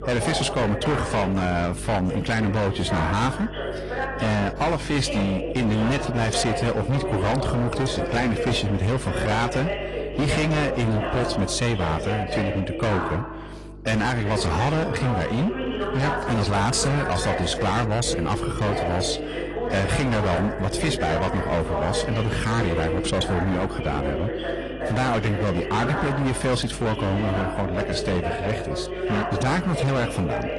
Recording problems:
distortion; heavy; 21% of the sound clipped
garbled, watery; slightly; nothing above 10 kHz
voice in the background; loud; throughout; 5 dB below the speech
electrical hum; faint; throughout; 50 Hz, 20 dB below the speech

